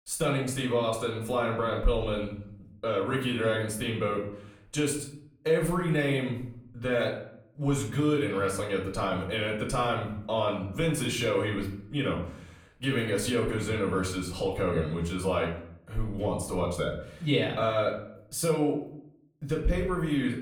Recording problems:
off-mic speech; far
room echo; slight; dies away in 0.5 s

